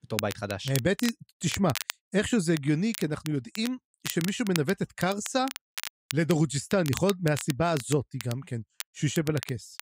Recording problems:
crackle, like an old record; noticeable; 10 dB below the speech

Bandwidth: 15.5 kHz